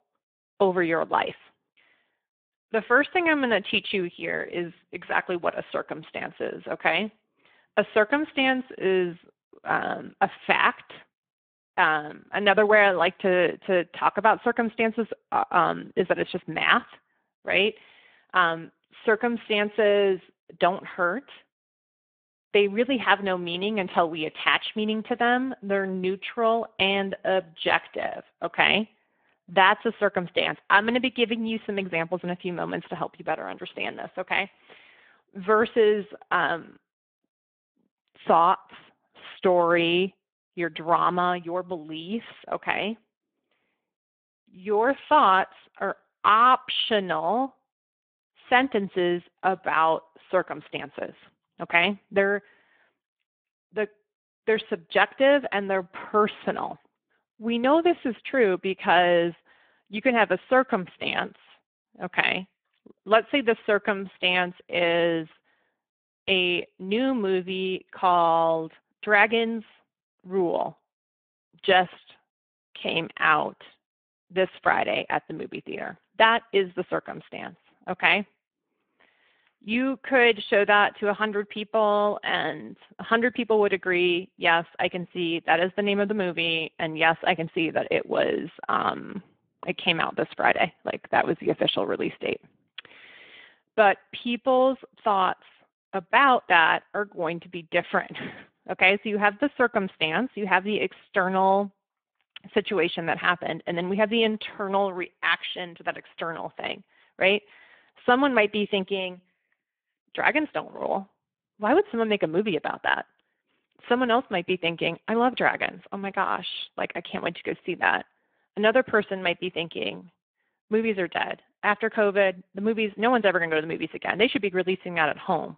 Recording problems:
phone-call audio

